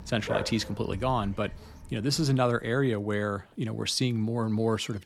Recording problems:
animal sounds; noticeable; throughout; 10 dB below the speech

